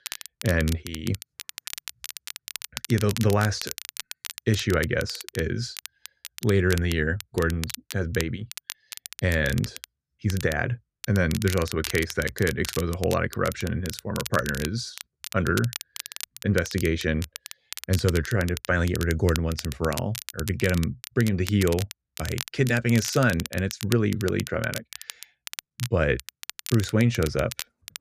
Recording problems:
crackle, like an old record; noticeable; 10 dB below the speech

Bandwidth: 14.5 kHz